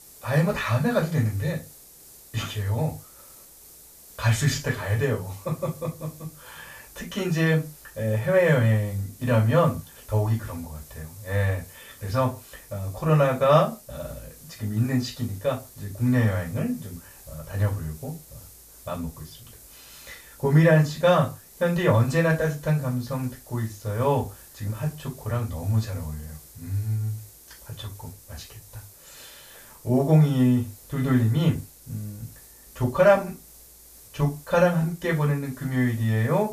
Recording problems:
off-mic speech; far
room echo; slight; dies away in 0.2 s
hiss; faint; throughout; 20 dB below the speech

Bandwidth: 14.5 kHz